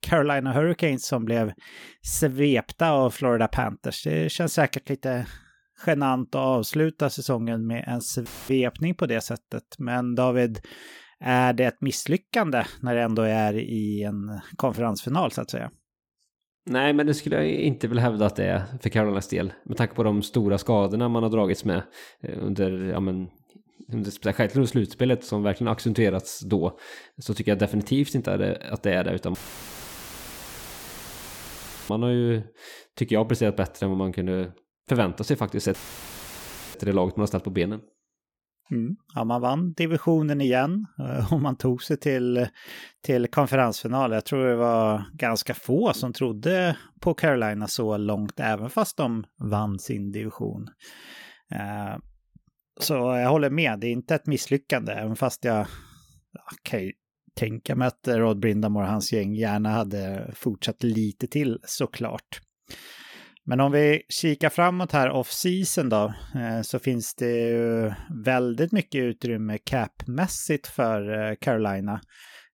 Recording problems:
audio cutting out; filled with static; at 8.5 s, at 29 s for 2.5 s and at 36 s for 1 s

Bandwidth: 18 kHz